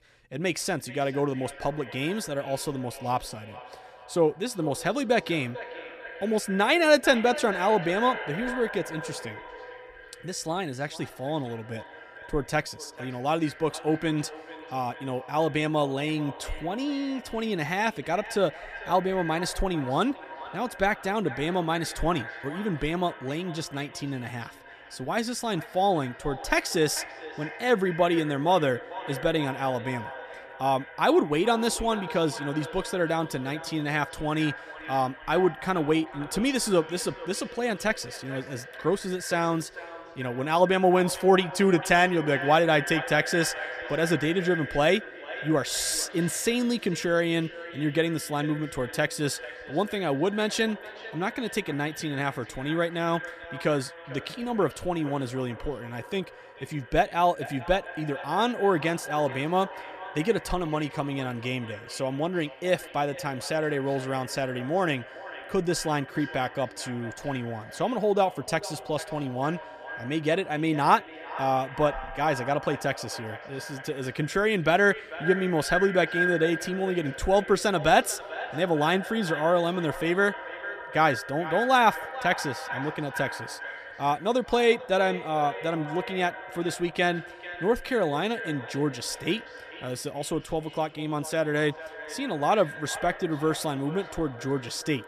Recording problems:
echo of what is said; strong; throughout; 440 ms later, 10 dB below the speech

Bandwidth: 14.5 kHz